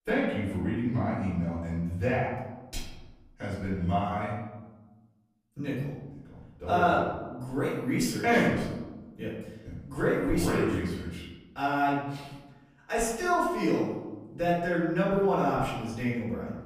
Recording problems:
off-mic speech; far
room echo; noticeable; dies away in 1.1 s

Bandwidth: 15 kHz